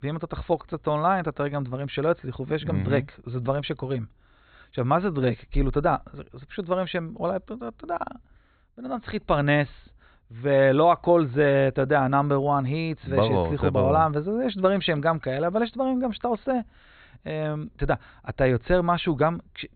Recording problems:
high frequencies cut off; severe; nothing above 4.5 kHz

